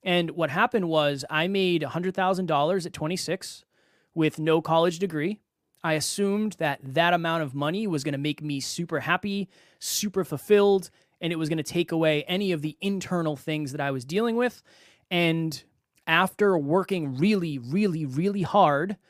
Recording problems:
none

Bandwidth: 15 kHz